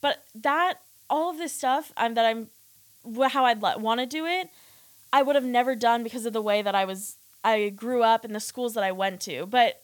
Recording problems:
hiss; faint; throughout; 25 dB below the speech

